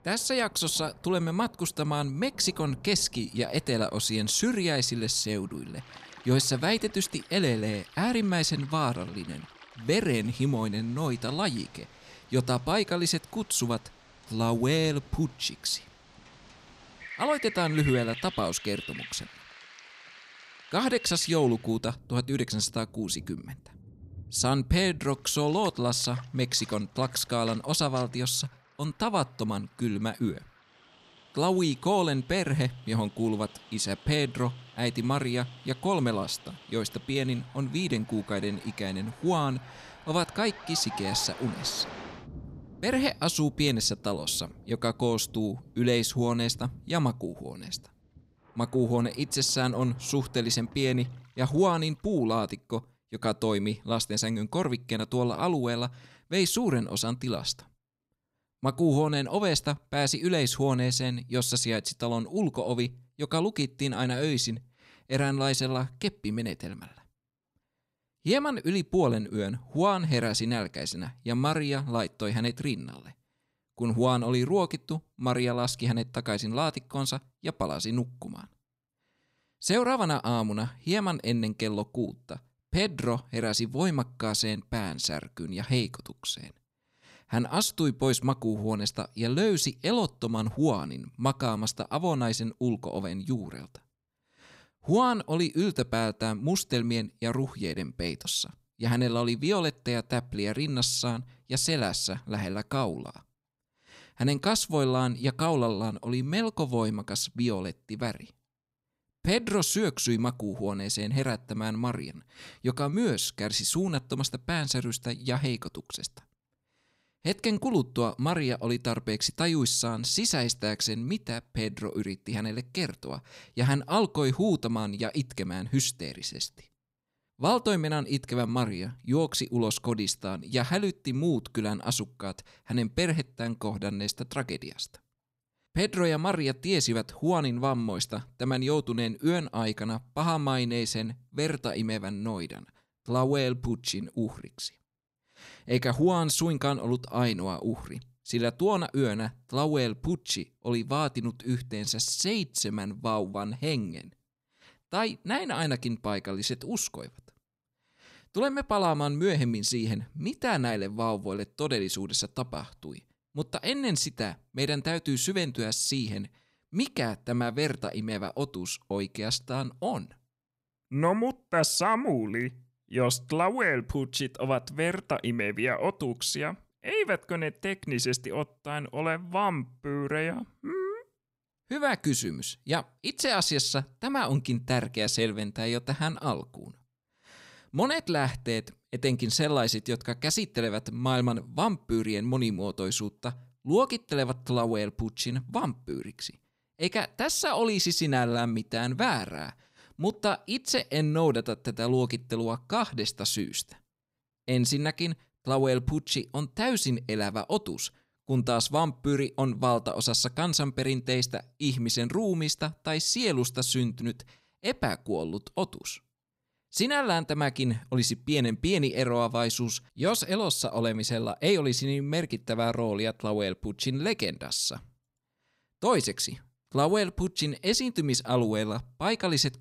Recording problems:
rain or running water; noticeable; until 52 s; 20 dB below the speech

